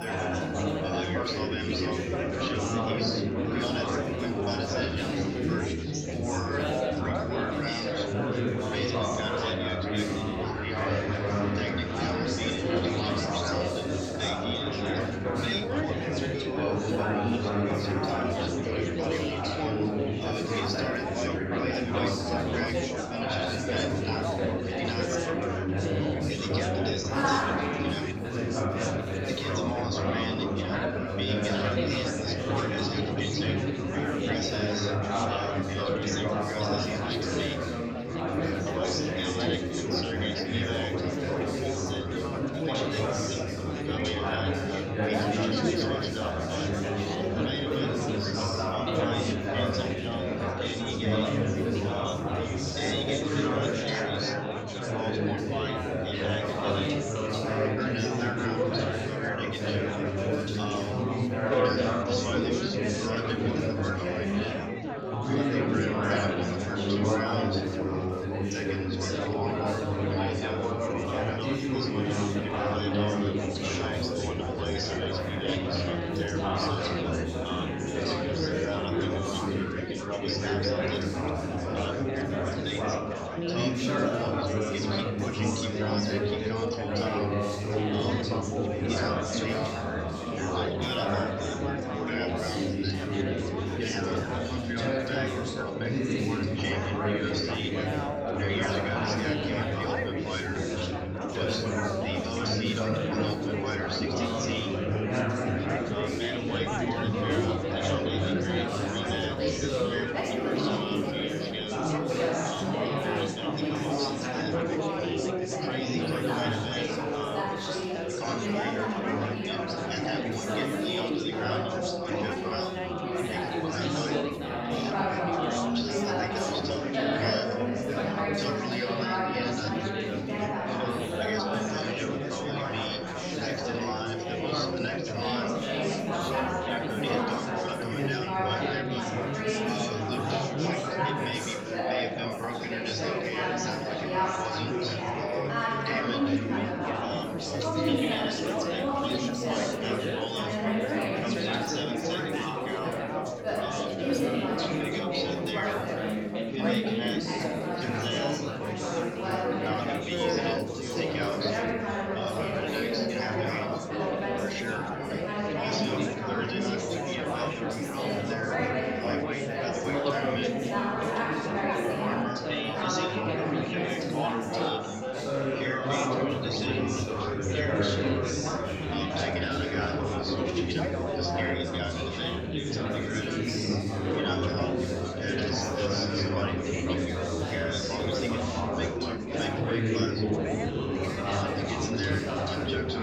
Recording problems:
room echo; strong; dies away in 2.1 s
off-mic speech; far
chatter from many people; very loud; throughout; 1 dB above the speech
background music; very faint; throughout; 25 dB below the speech

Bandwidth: 18 kHz